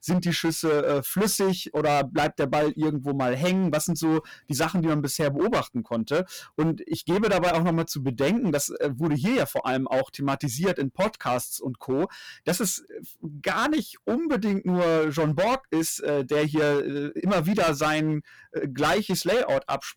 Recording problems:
distortion; heavy; 16% of the sound clipped

